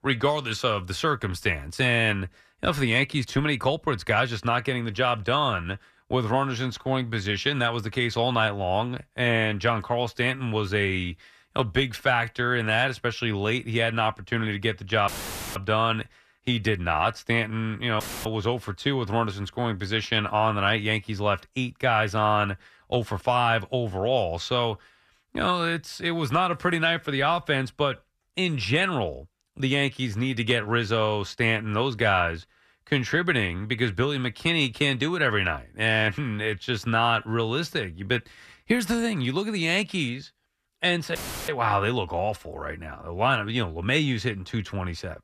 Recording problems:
audio cutting out; filled with static; at 15 s, at 18 s and at 41 s

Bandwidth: 14.5 kHz